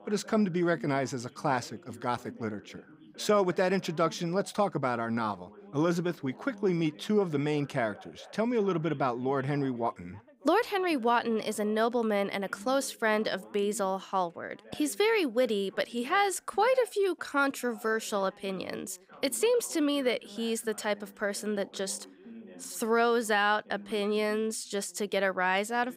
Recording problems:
background chatter; faint; throughout; 2 voices, 20 dB below the speech

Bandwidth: 15.5 kHz